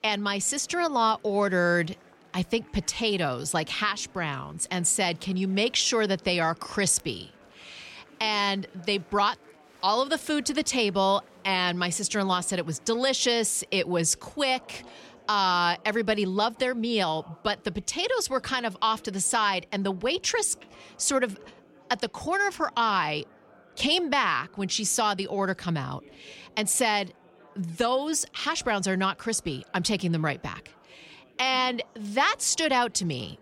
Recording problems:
chatter from many people; faint; throughout; 30 dB below the speech

